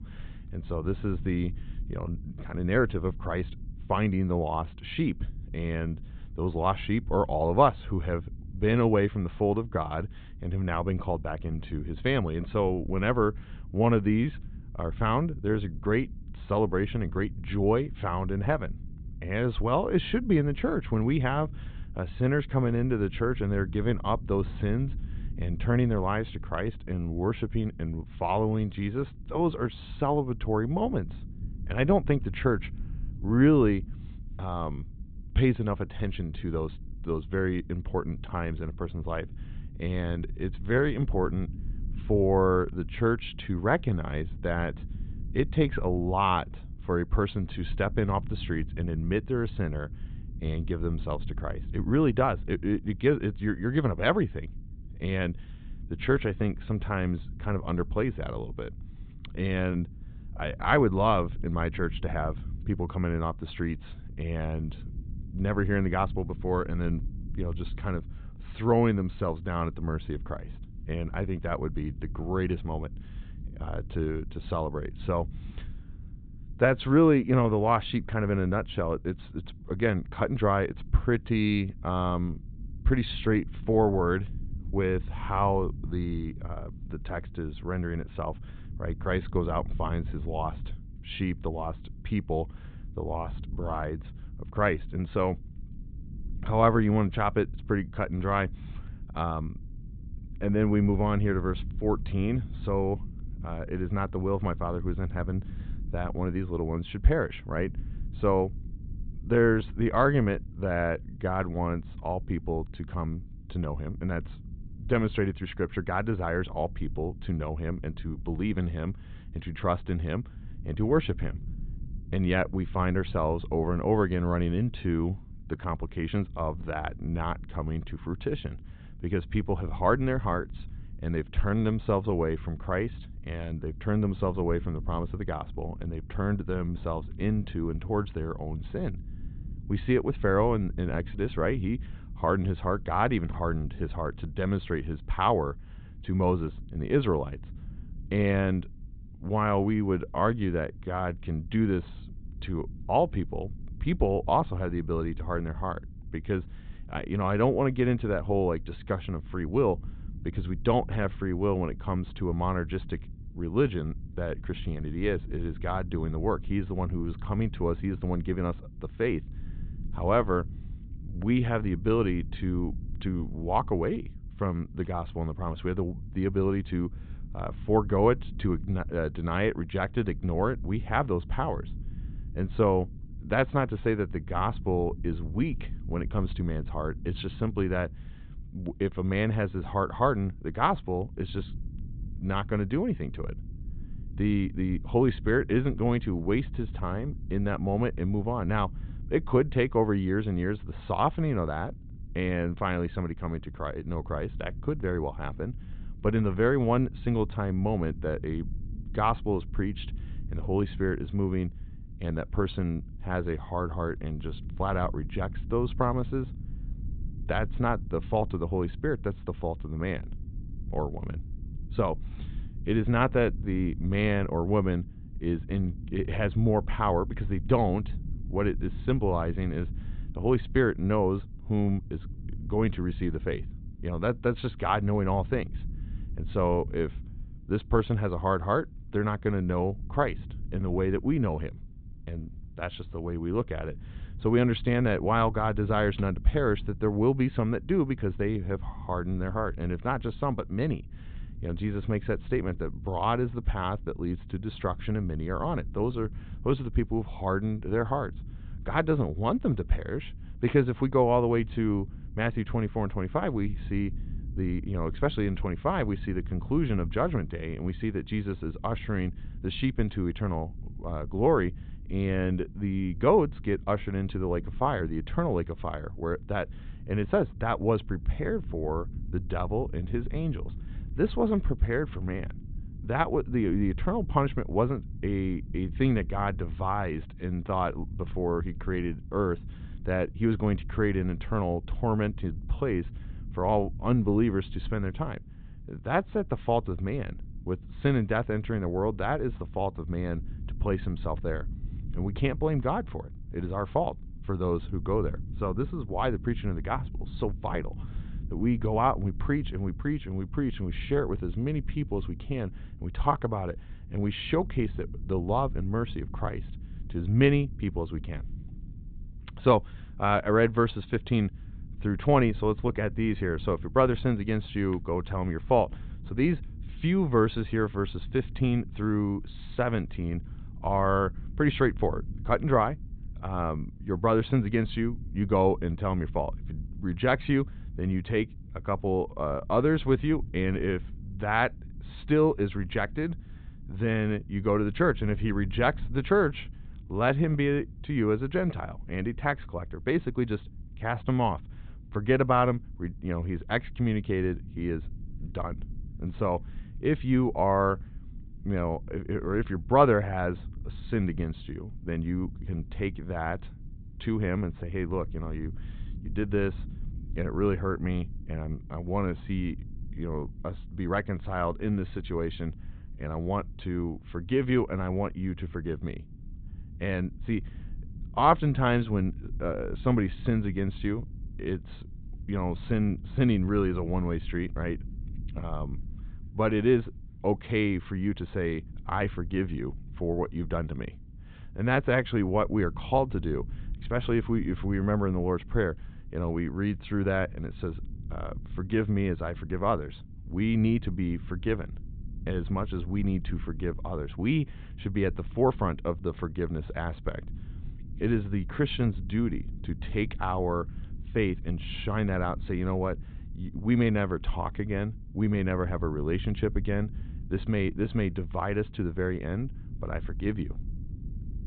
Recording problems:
high frequencies cut off; severe; nothing above 4 kHz
low rumble; faint; throughout; 25 dB below the speech

